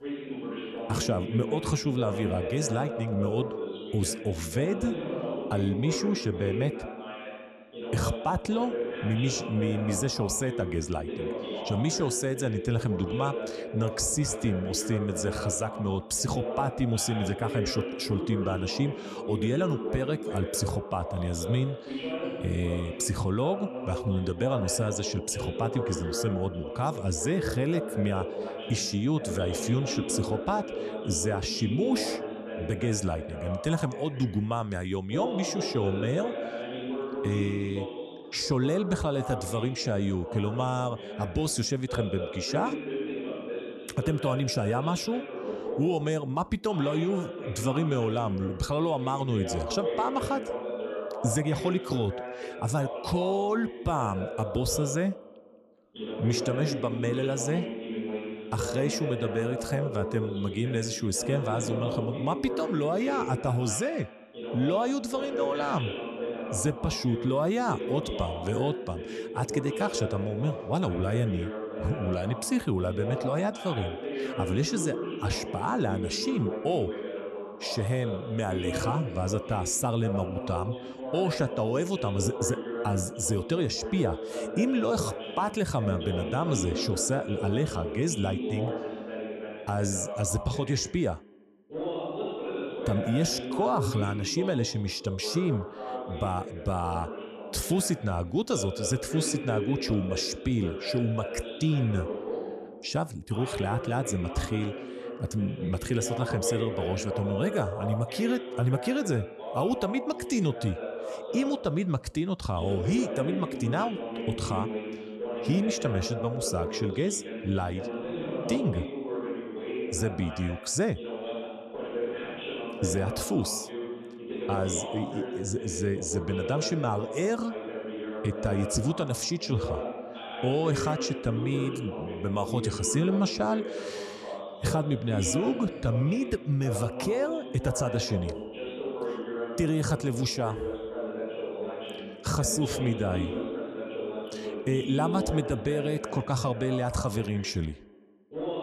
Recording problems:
voice in the background; loud; throughout; 6 dB below the speech

